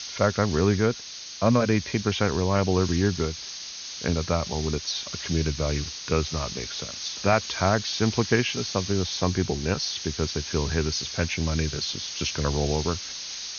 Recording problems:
high frequencies cut off; noticeable; nothing above 6.5 kHz
hiss; loud; throughout; 7 dB below the speech

